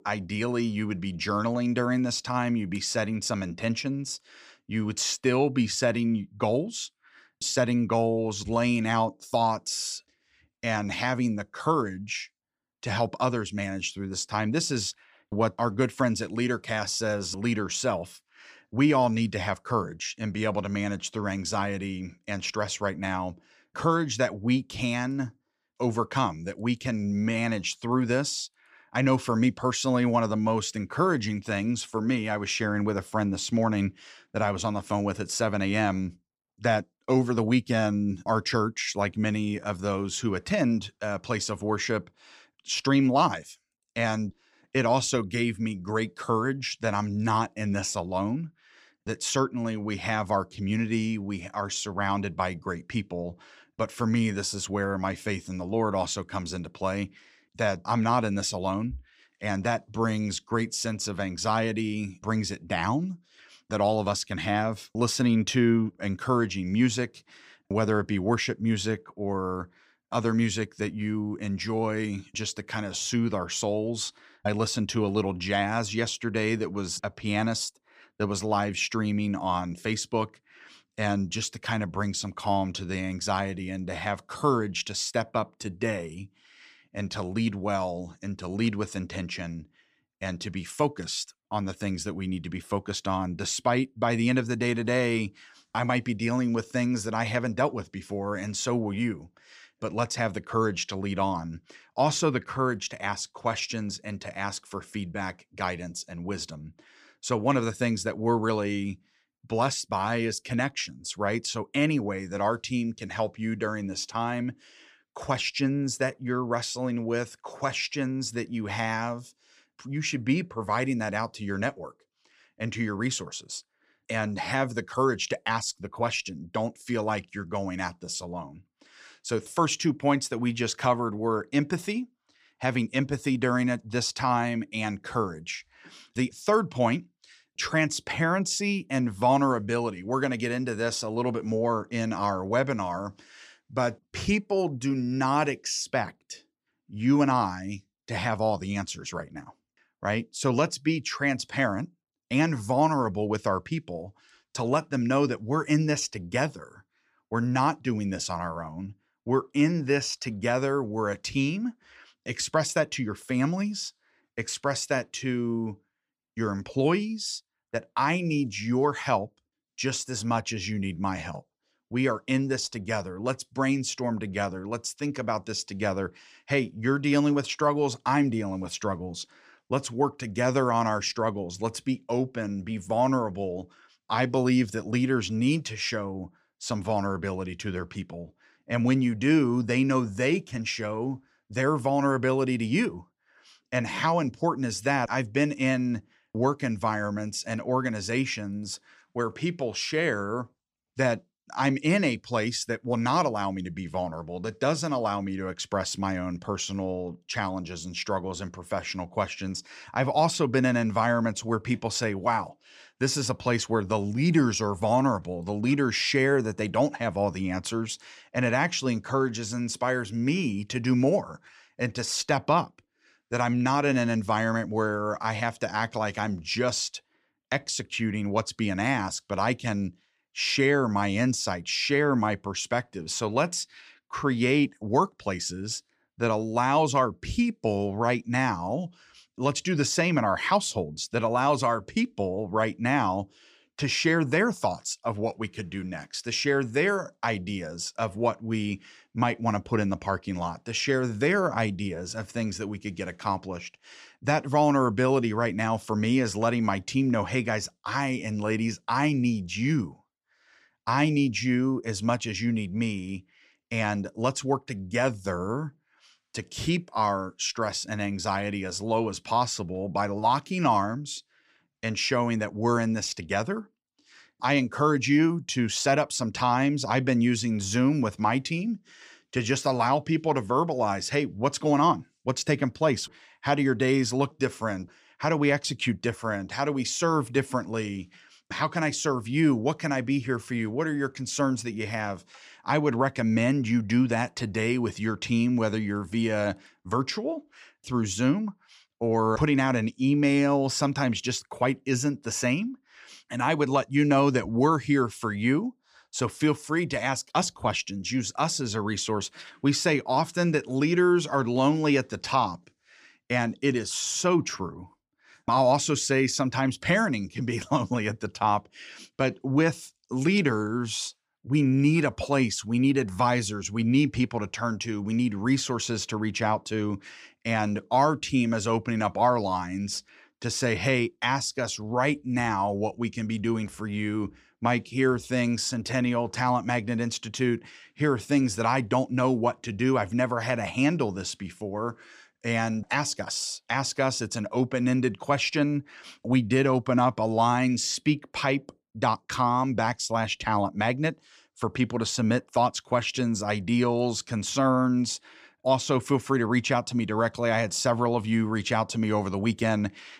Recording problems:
none

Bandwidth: 15 kHz